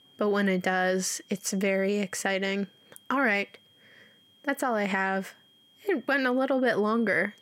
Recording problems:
high-pitched whine; faint; throughout; 3 kHz, 30 dB below the speech

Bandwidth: 16 kHz